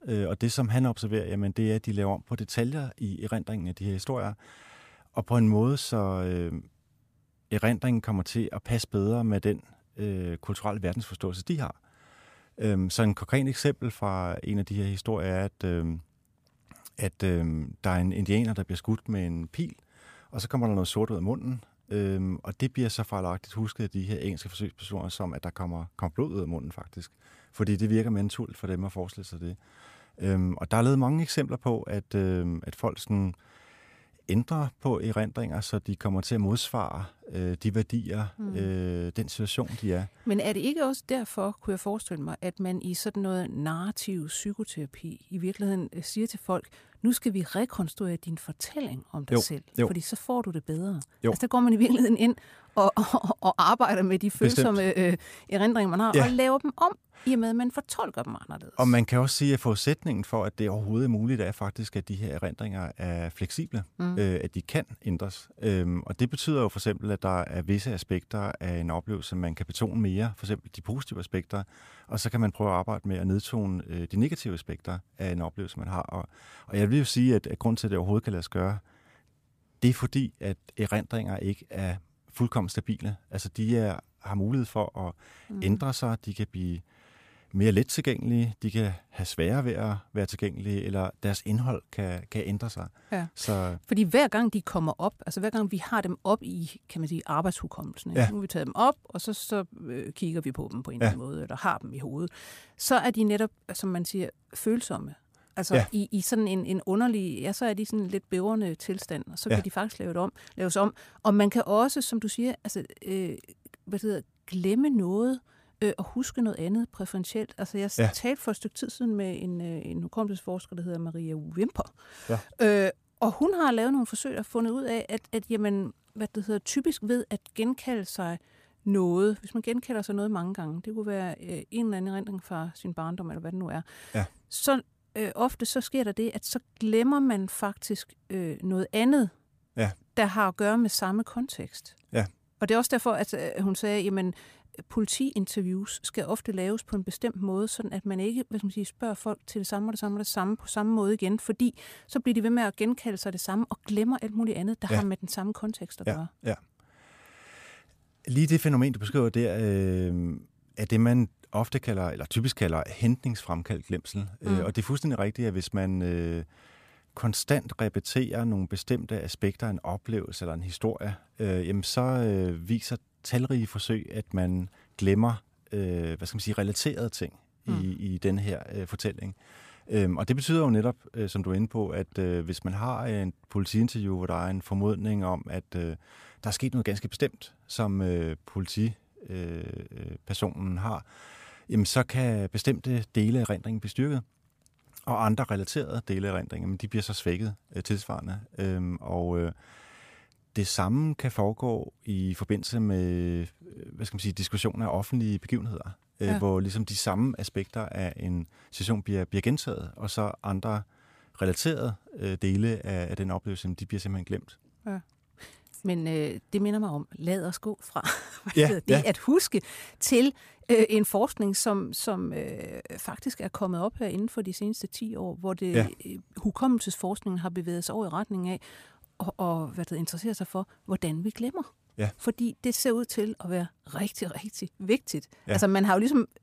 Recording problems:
none

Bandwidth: 15 kHz